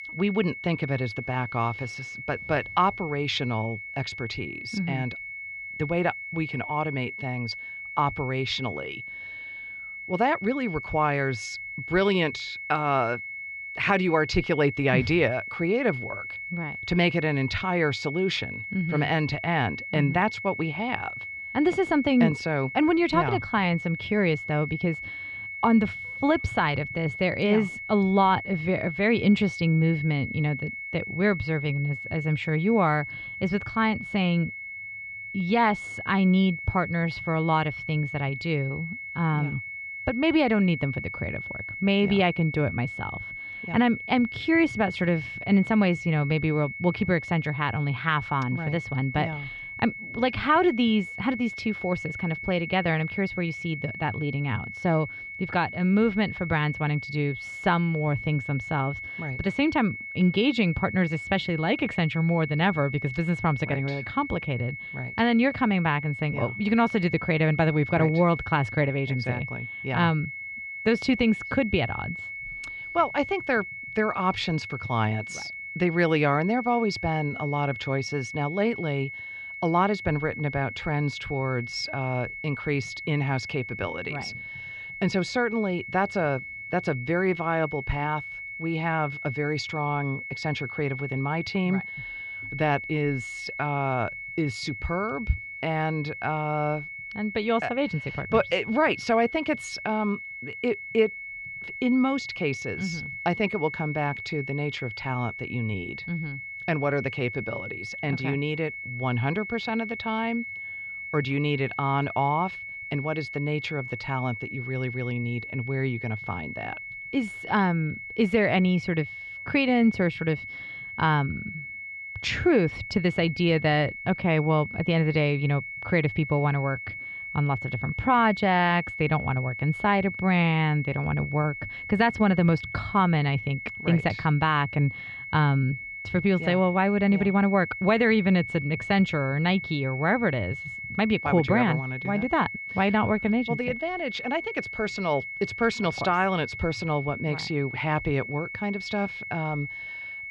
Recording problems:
muffled; slightly; fading above 3.5 kHz
high-pitched whine; loud; throughout; 2 kHz, 9 dB below the speech

